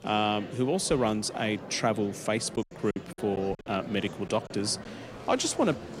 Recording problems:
murmuring crowd; noticeable; throughout; 15 dB below the speech
choppy; very; from 2.5 to 4.5 s; 9% of the speech affected

